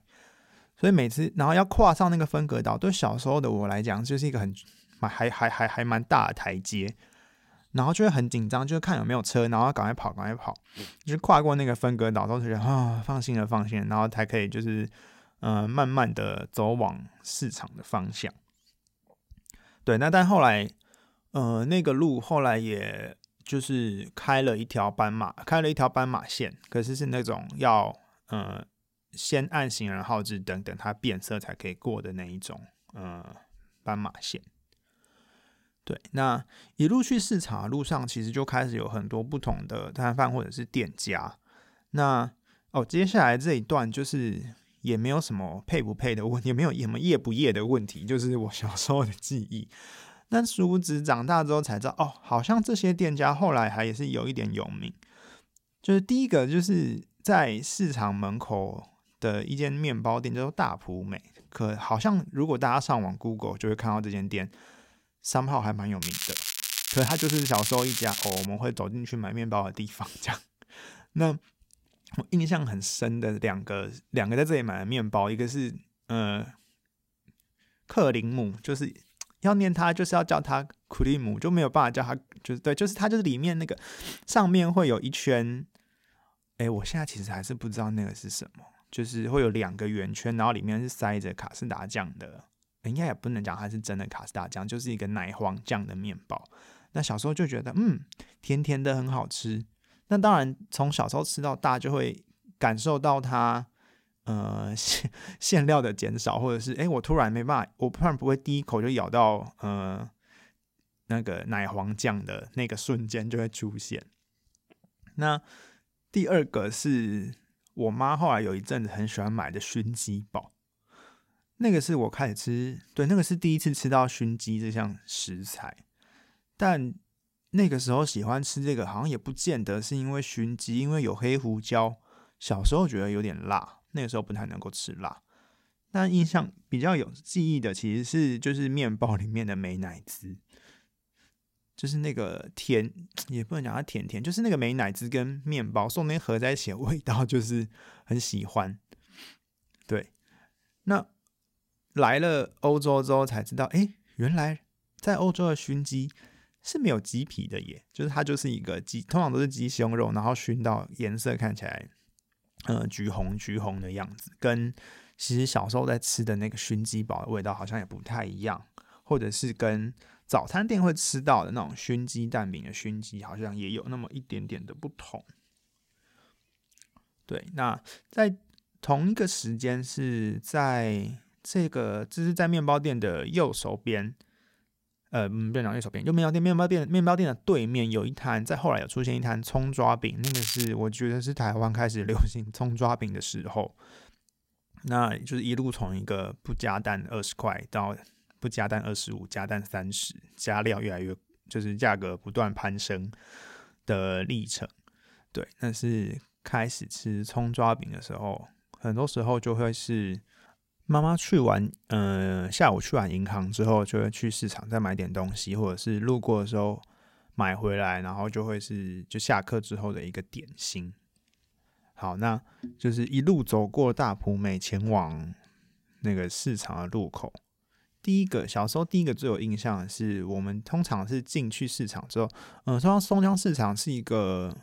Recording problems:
crackling; loud; from 1:06 to 1:08 and at 3:10; 2 dB below the speech

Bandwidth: 16 kHz